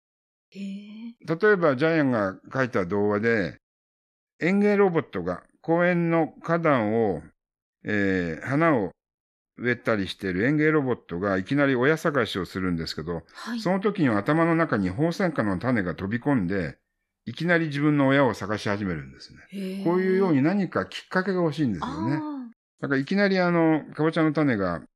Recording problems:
none

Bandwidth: 13.5 kHz